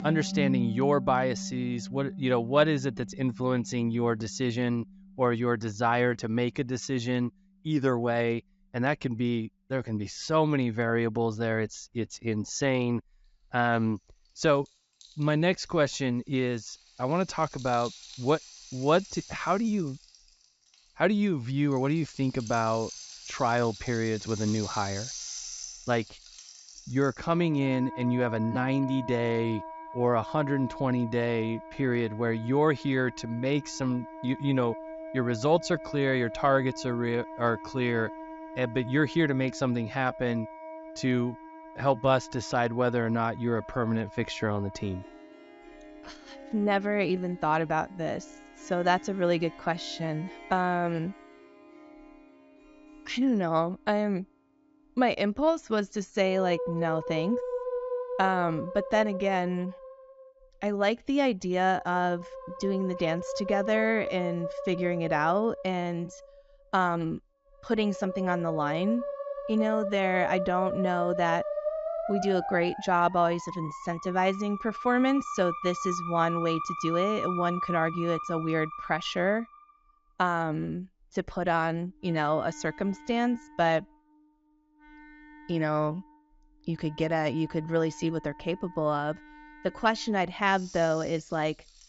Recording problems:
high frequencies cut off; noticeable; nothing above 8 kHz
background music; noticeable; throughout; 10 dB below the speech

